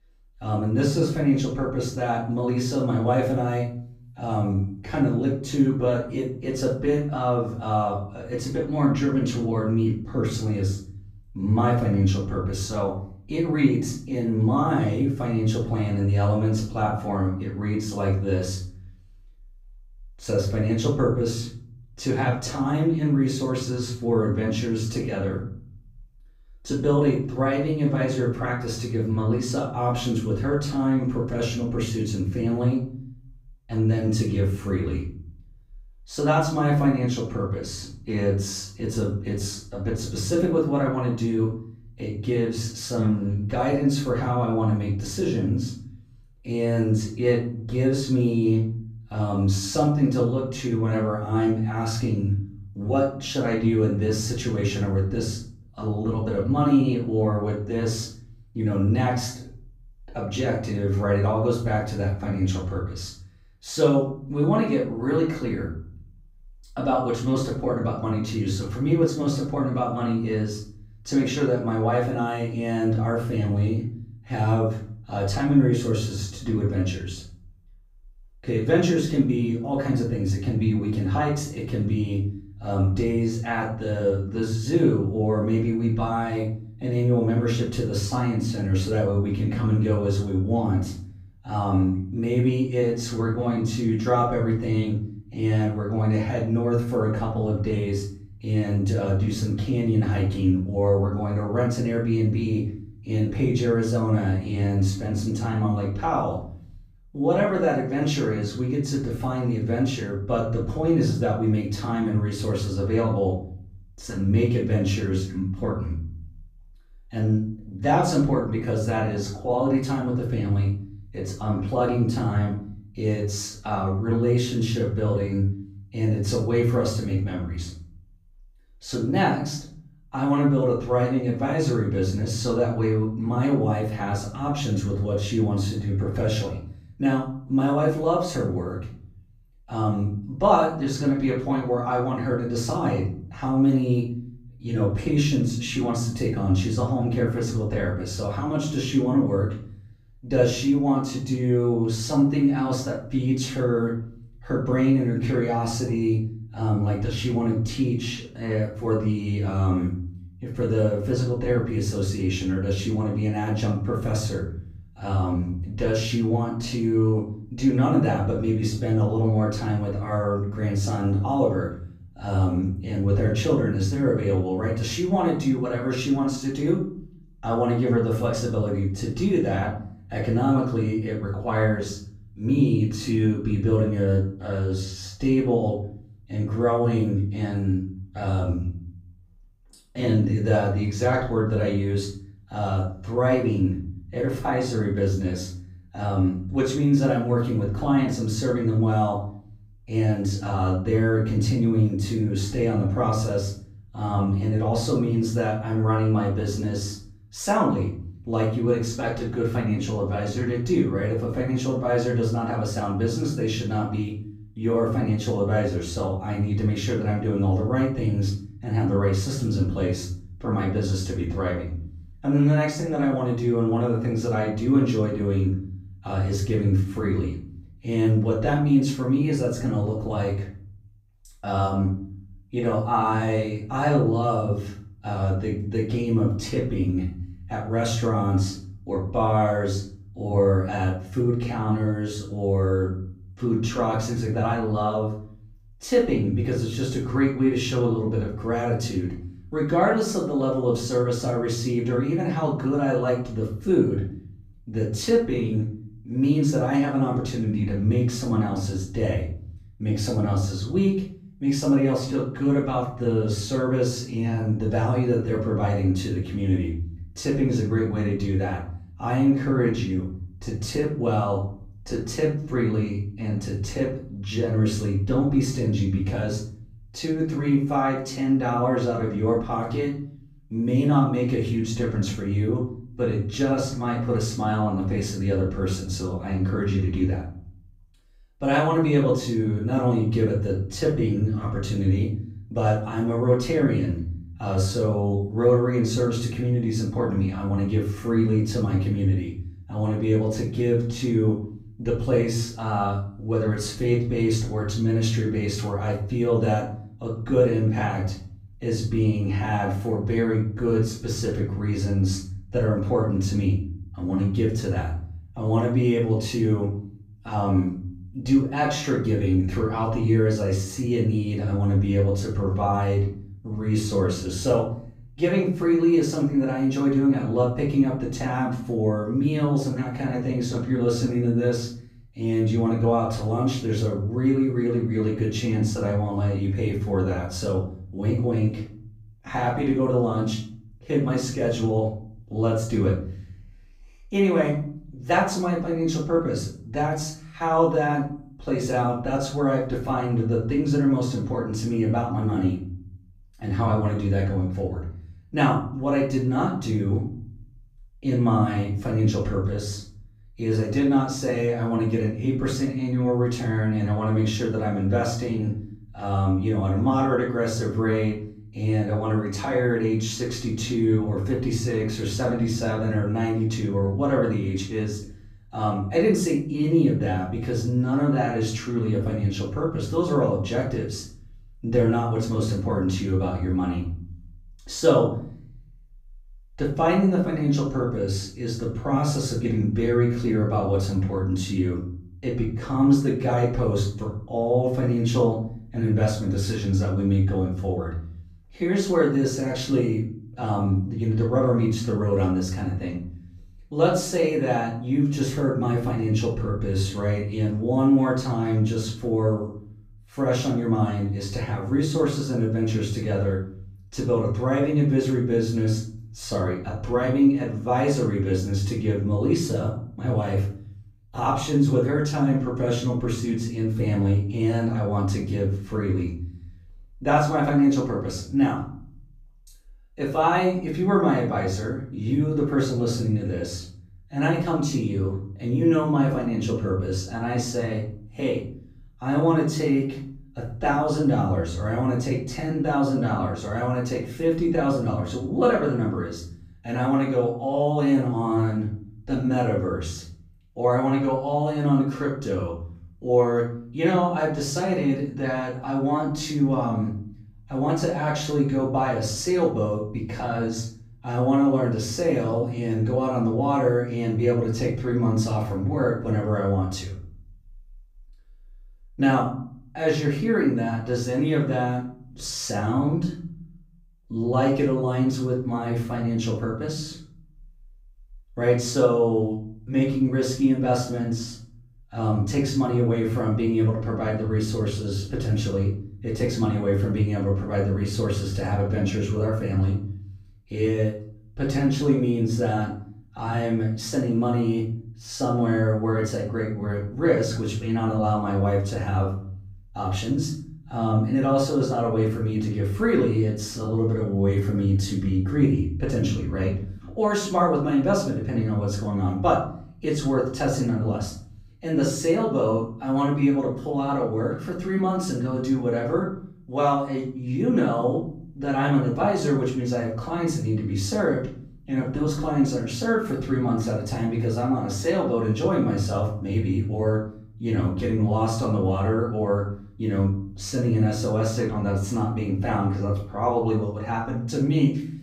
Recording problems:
off-mic speech; far
room echo; noticeable; dies away in 0.6 s

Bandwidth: 15.5 kHz